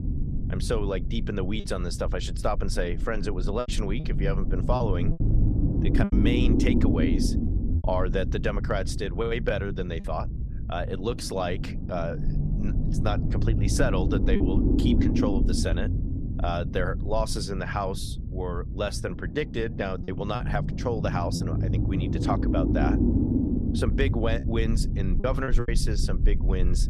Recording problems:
low rumble; loud; throughout; 5 dB below the speech
choppy; occasionally; 3% of the speech affected

